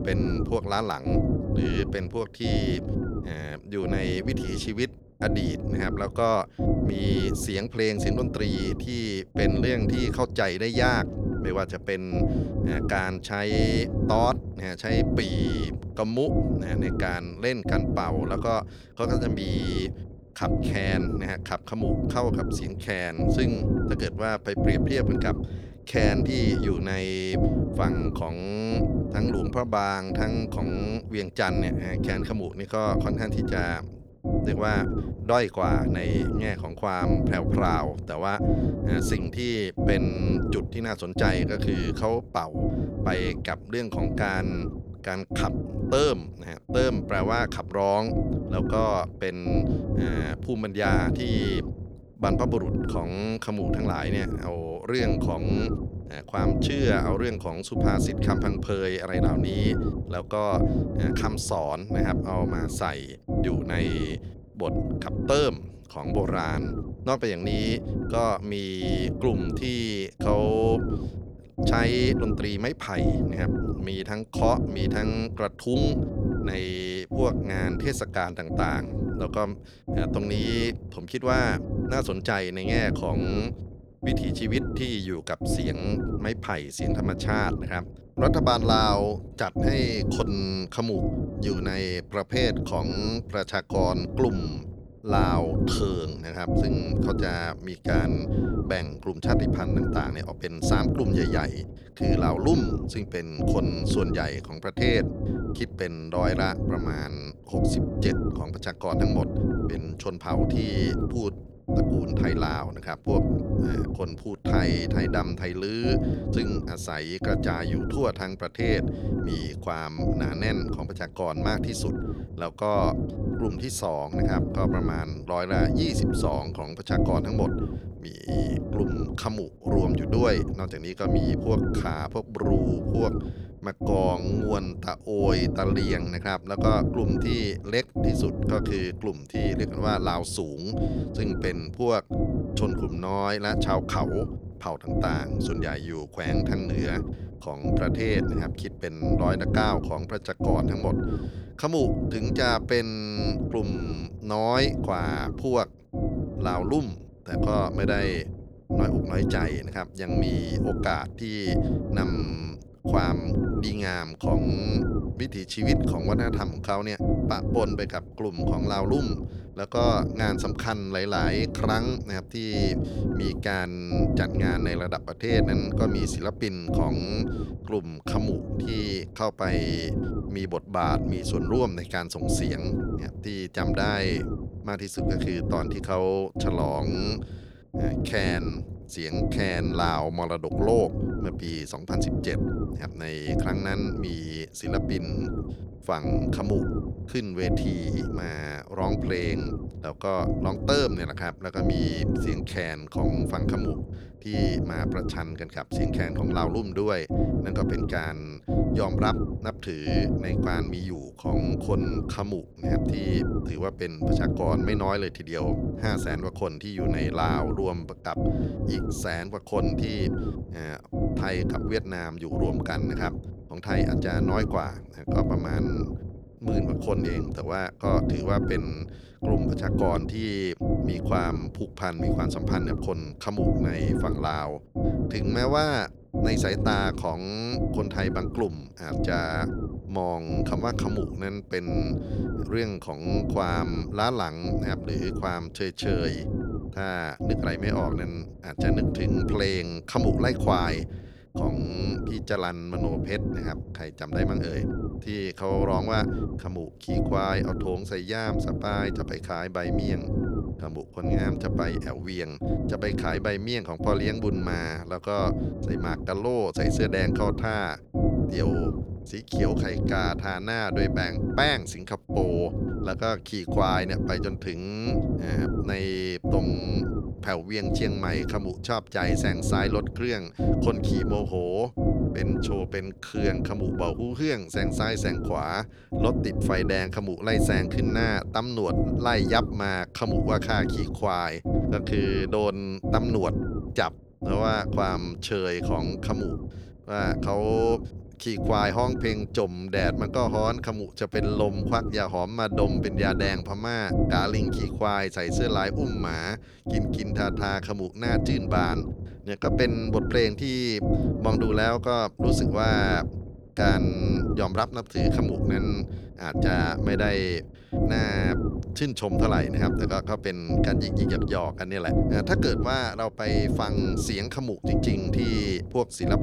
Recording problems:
low rumble; loud; throughout; 4 dB below the speech

